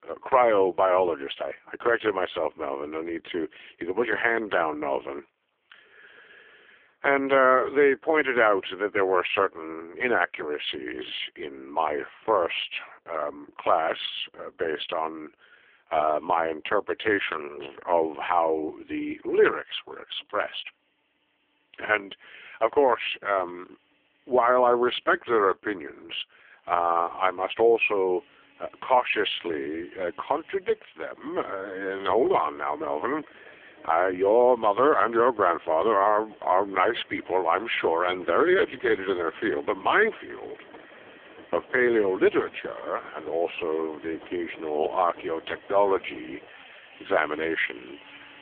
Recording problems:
phone-call audio; poor line; nothing above 3.5 kHz
machinery noise; faint; throughout; 25 dB below the speech

